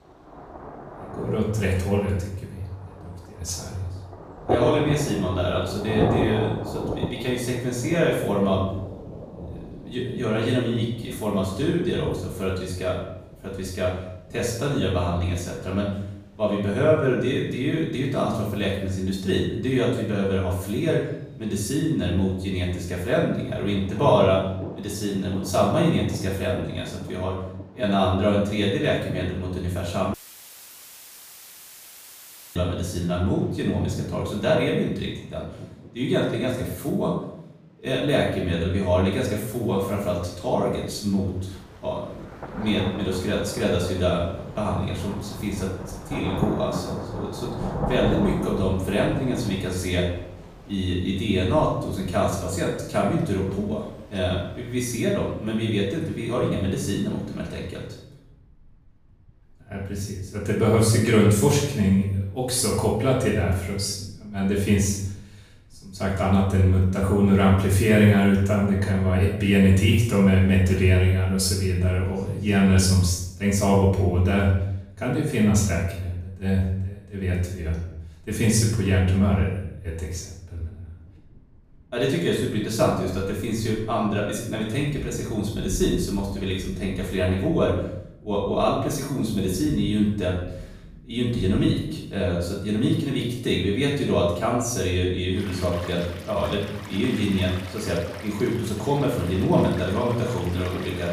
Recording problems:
off-mic speech; far
room echo; noticeable; dies away in 0.7 s
rain or running water; noticeable; throughout; 10 dB below the speech
audio cutting out; filled with static; at 30 s for 2.5 s

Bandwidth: 15 kHz